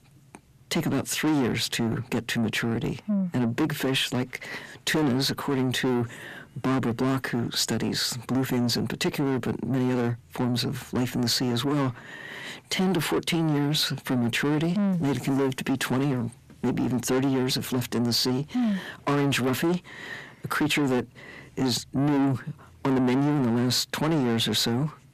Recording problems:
distortion; heavy; 6 dB below the speech

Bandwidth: 14.5 kHz